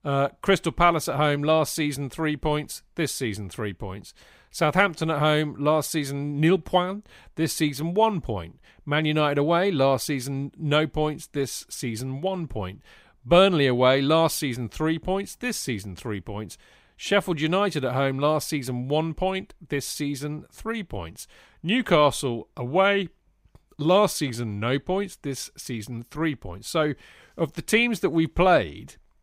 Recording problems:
none

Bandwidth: 15.5 kHz